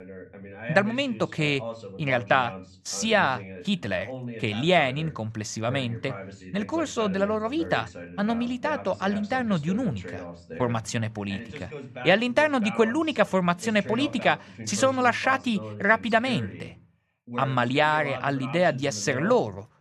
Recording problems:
voice in the background; noticeable; throughout; 15 dB below the speech

